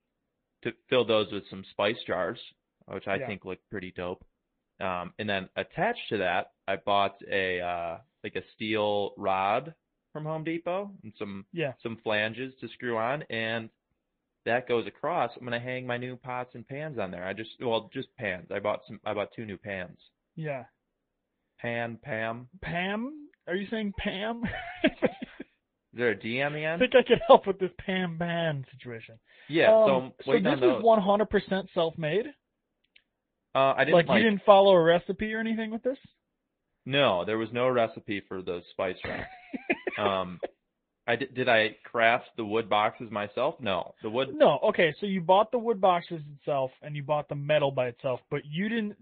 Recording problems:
high frequencies cut off; severe; nothing above 3.5 kHz
garbled, watery; slightly

